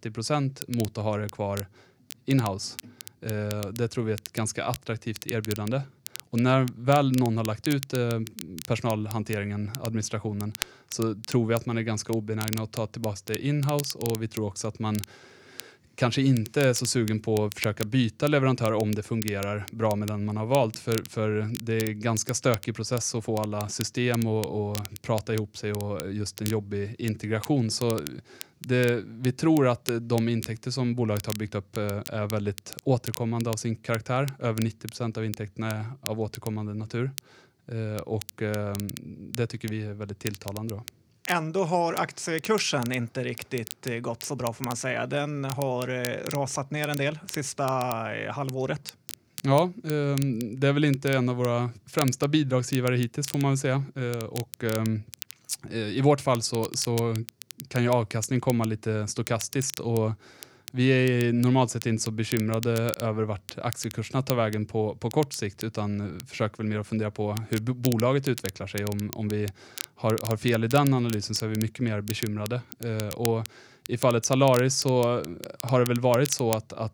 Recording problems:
crackle, like an old record; noticeable; 15 dB below the speech

